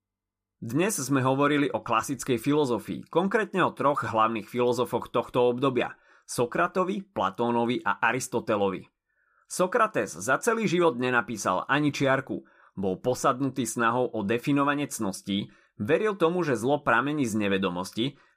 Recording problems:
none

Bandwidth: 14.5 kHz